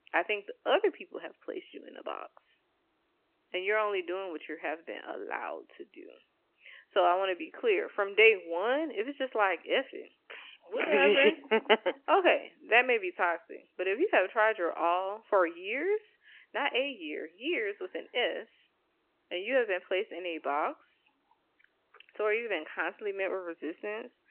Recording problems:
phone-call audio; nothing above 3 kHz

